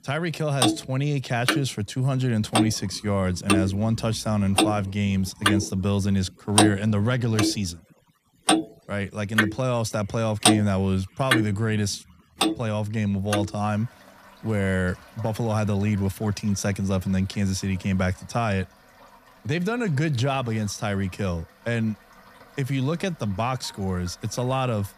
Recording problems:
household noises; very loud; throughout; 1 dB above the speech

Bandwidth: 14.5 kHz